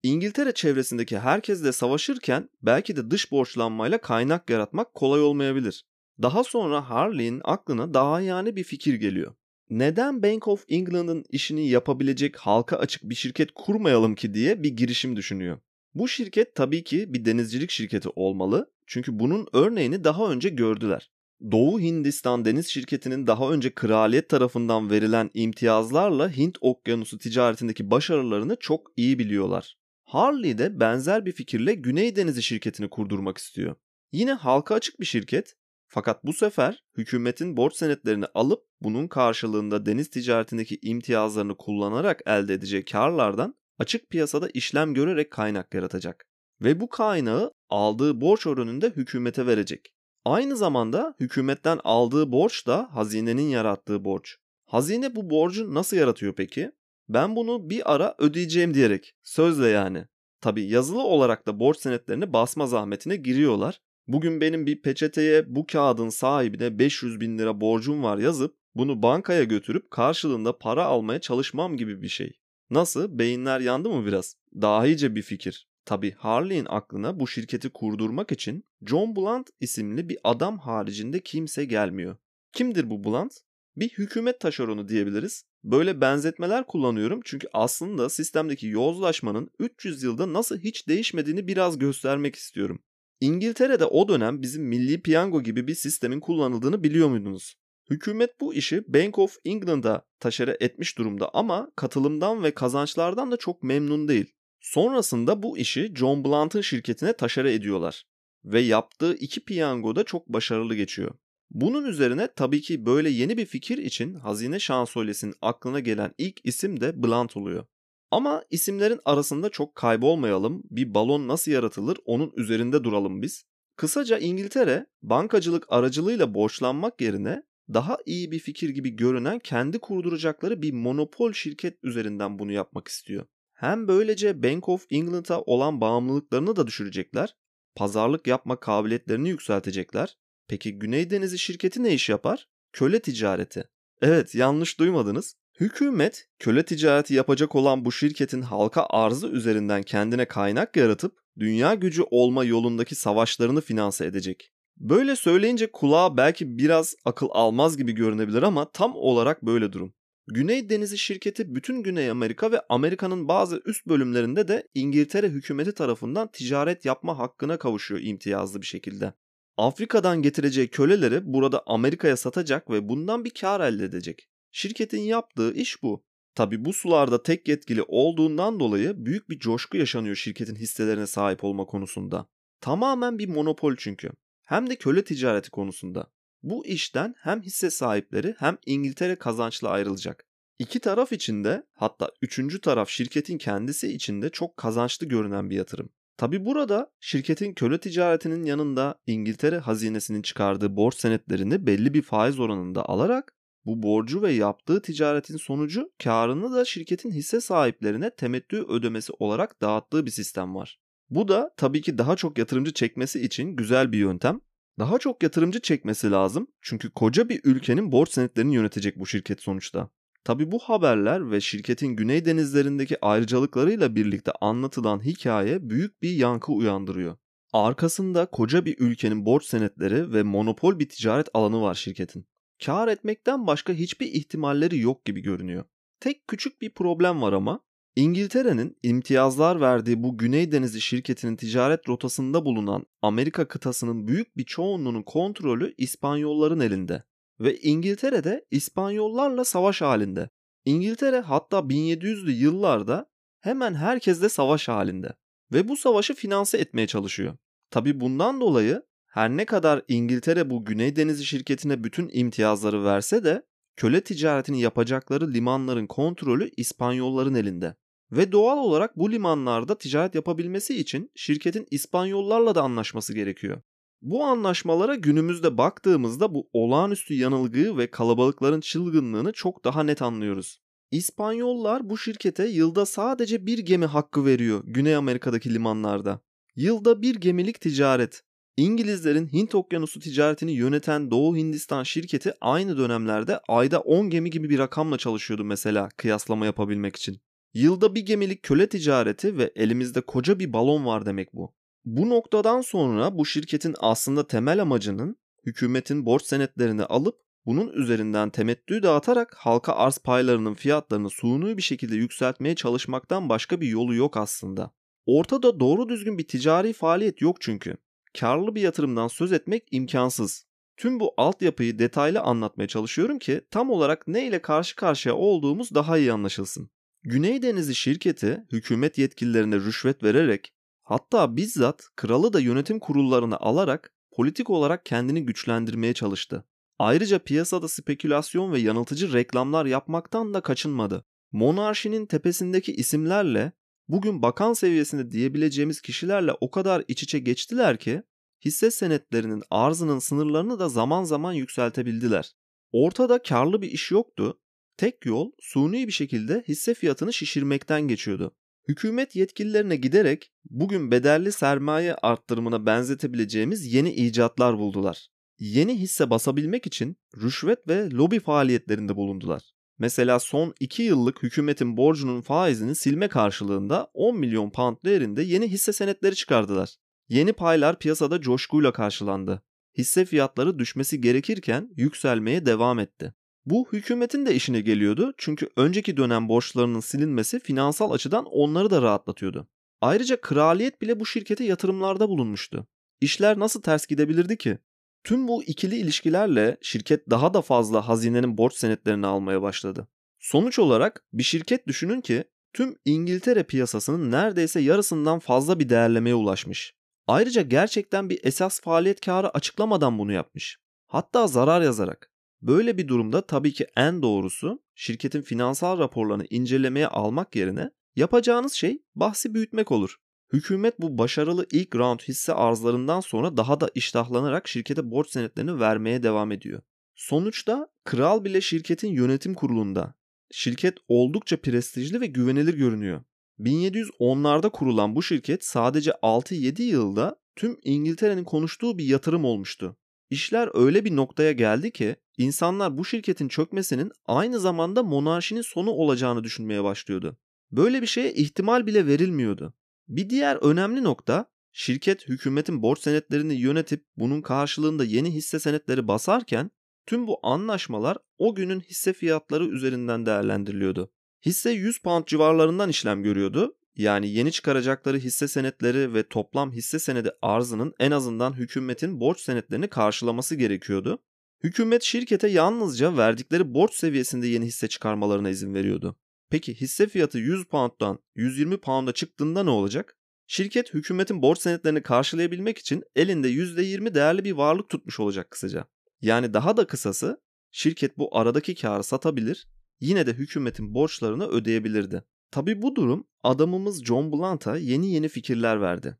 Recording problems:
none

